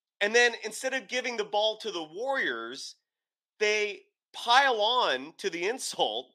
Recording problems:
thin; somewhat; fading below 350 Hz

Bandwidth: 15 kHz